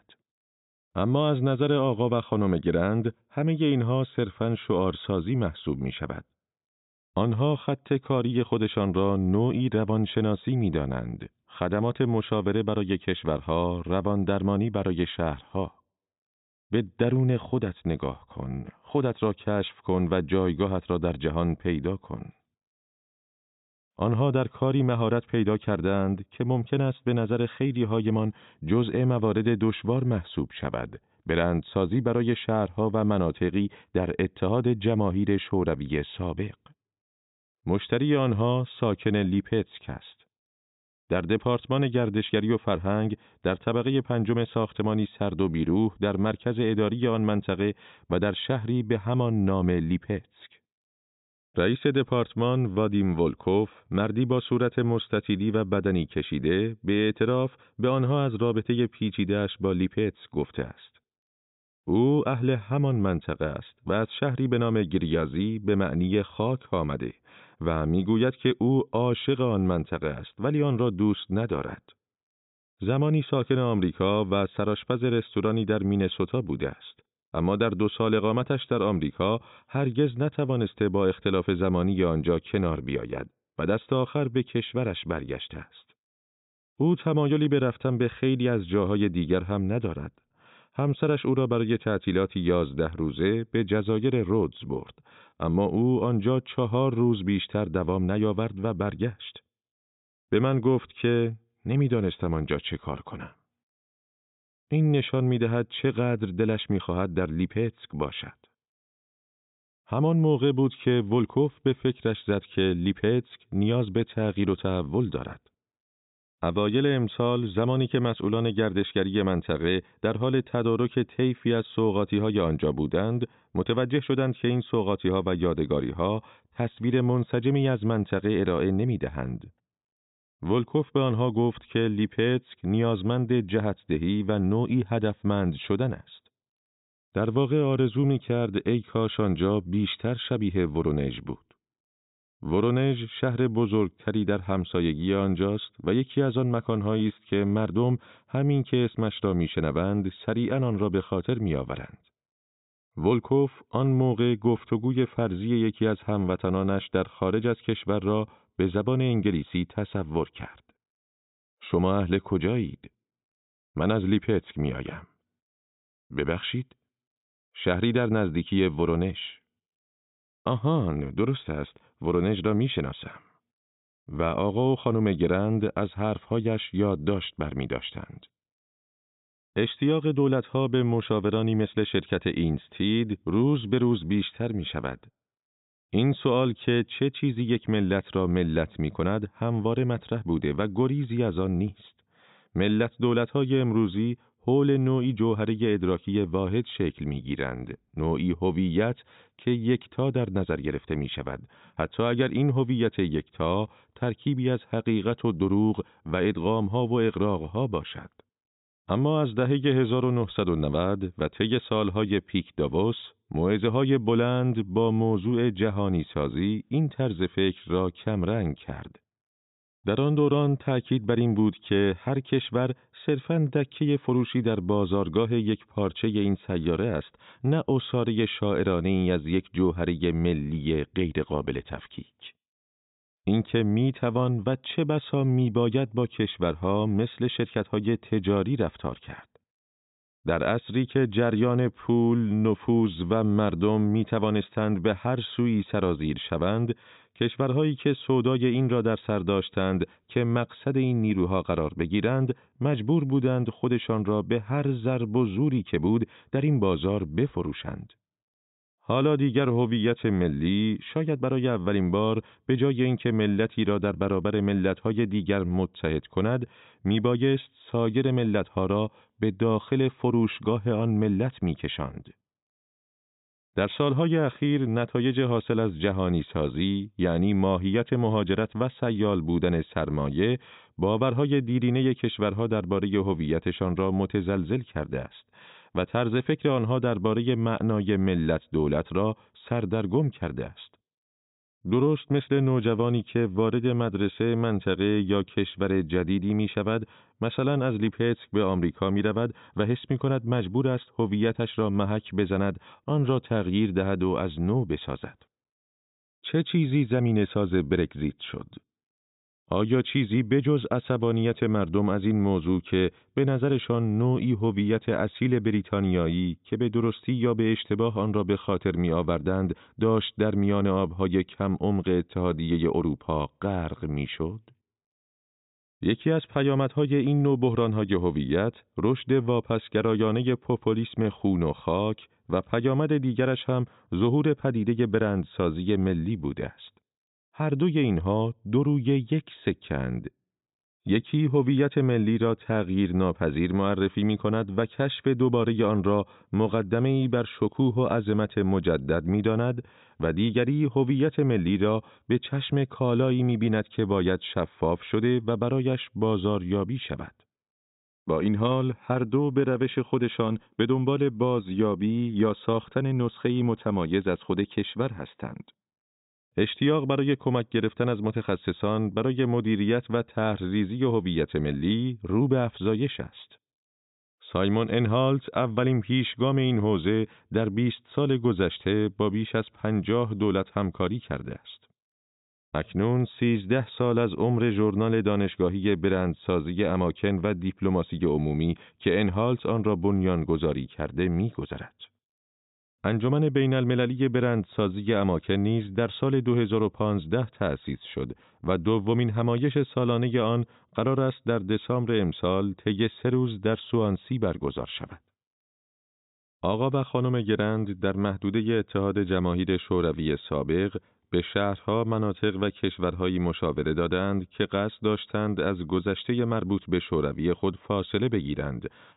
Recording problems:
high frequencies cut off; severe; nothing above 4 kHz

